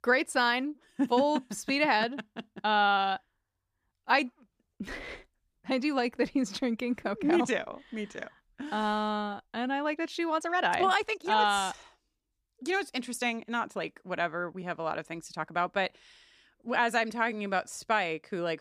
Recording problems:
uneven, jittery; strongly; from 1 to 18 s

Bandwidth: 15 kHz